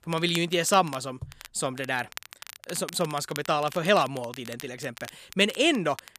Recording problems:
crackle, like an old record; noticeable; 15 dB below the speech

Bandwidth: 14.5 kHz